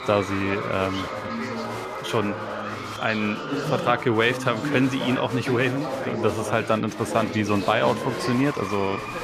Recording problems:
chatter from many people; loud; throughout; 6 dB below the speech

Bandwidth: 14.5 kHz